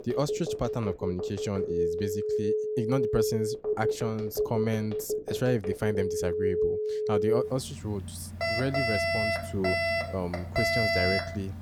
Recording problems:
alarms or sirens; very loud; throughout; 3 dB above the speech

